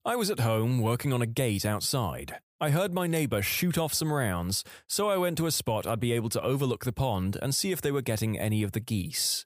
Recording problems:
none

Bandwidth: 15 kHz